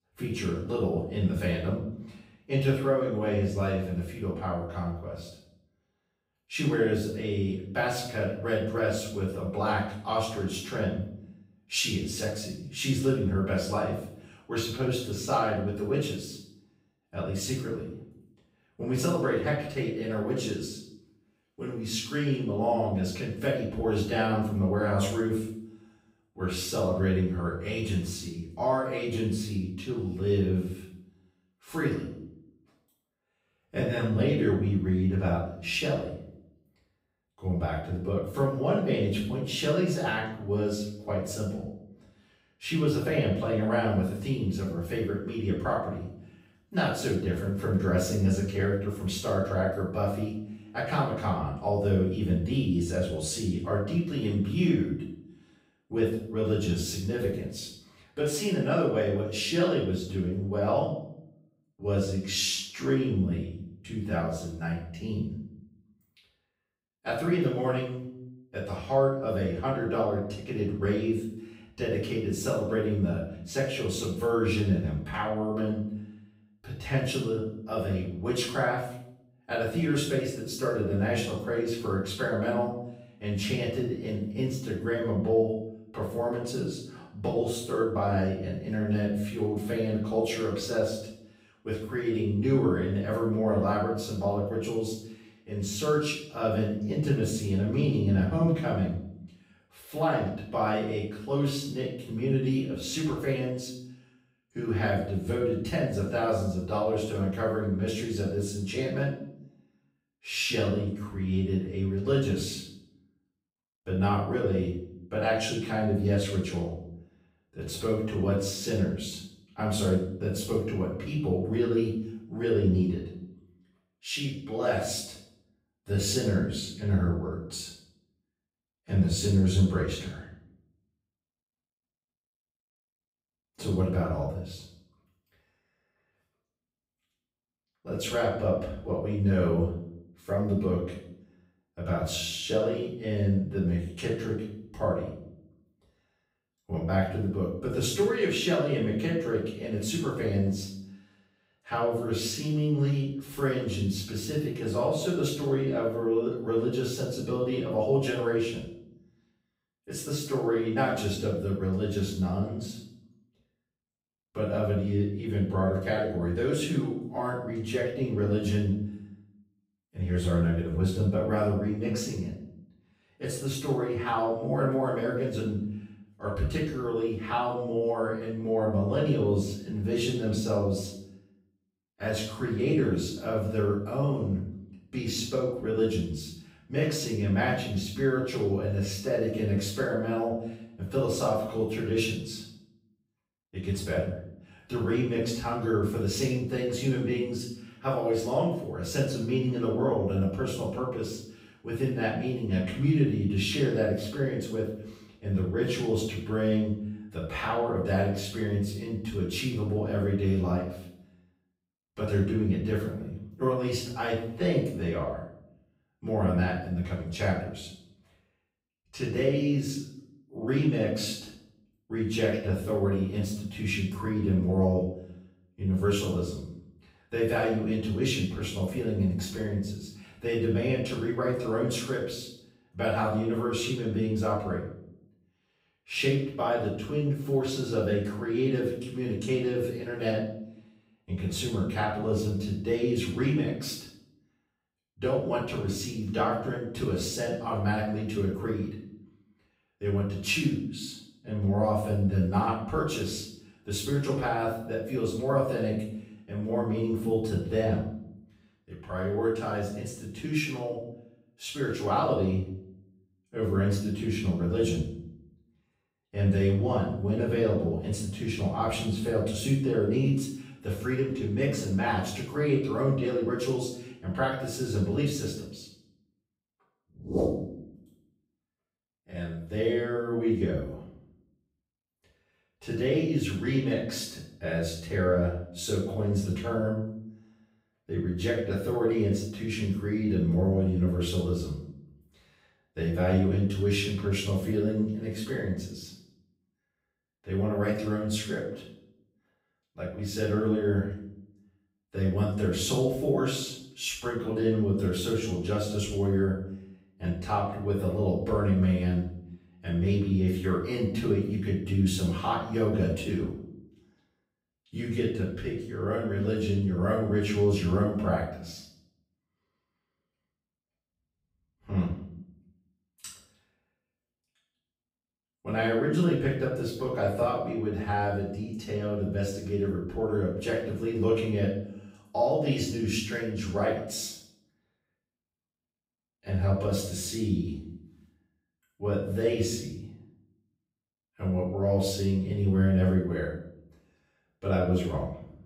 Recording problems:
off-mic speech; far
room echo; noticeable; dies away in 0.6 s

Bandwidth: 15.5 kHz